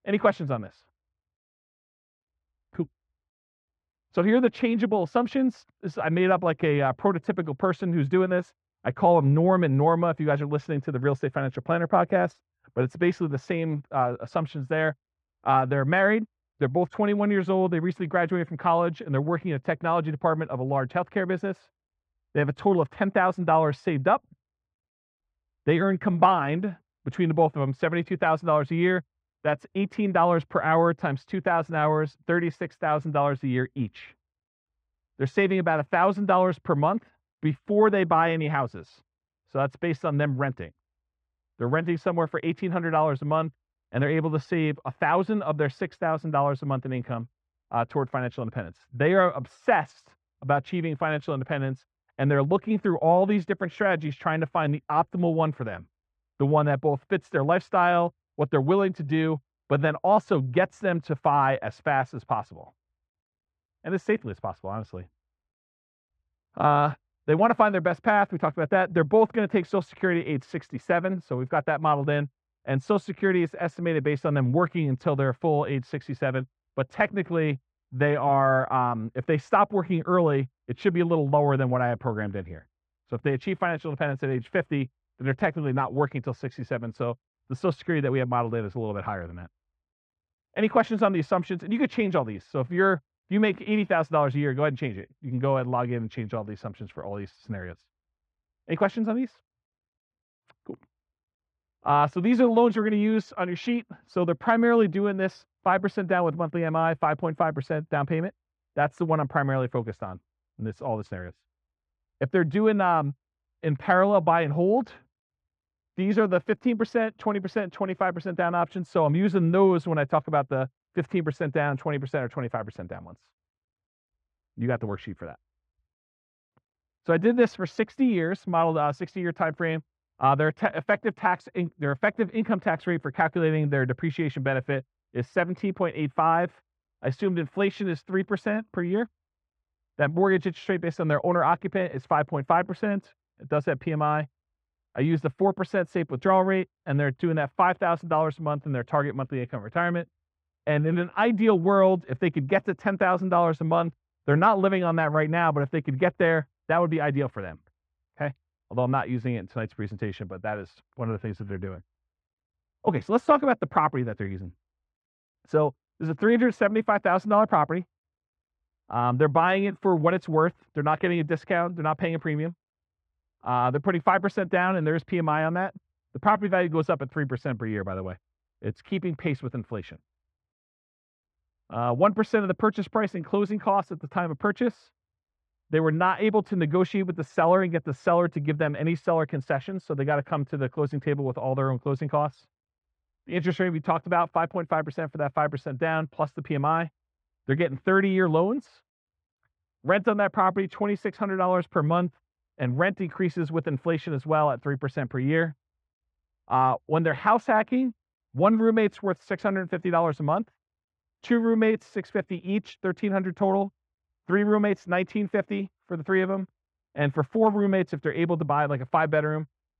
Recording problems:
muffled; very; fading above 1.5 kHz

